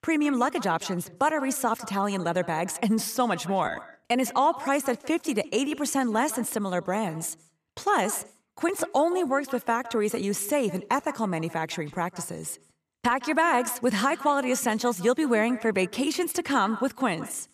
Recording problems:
echo of what is said; noticeable; throughout; 160 ms later, 15 dB below the speech

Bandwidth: 14.5 kHz